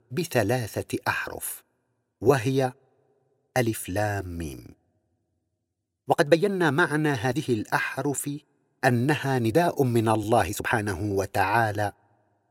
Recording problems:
uneven, jittery; strongly; from 1 to 12 s

